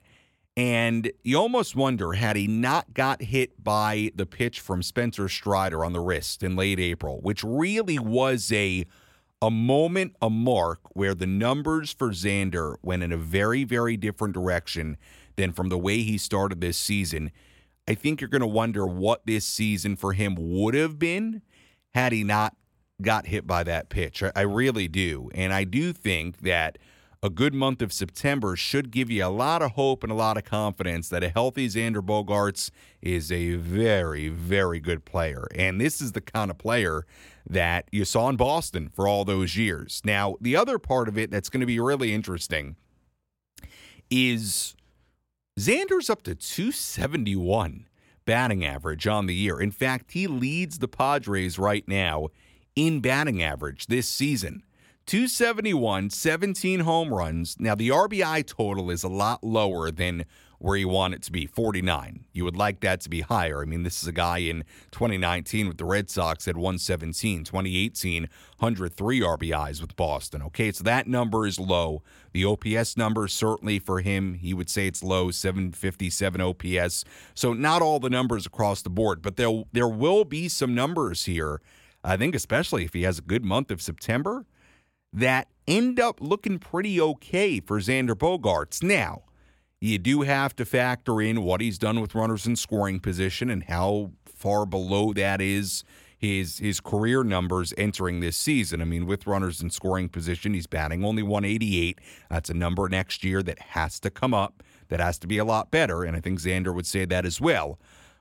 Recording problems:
none

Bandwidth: 16.5 kHz